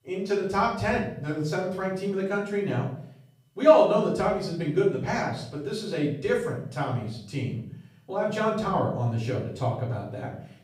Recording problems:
off-mic speech; far
room echo; noticeable; dies away in 0.5 s

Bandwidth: 15.5 kHz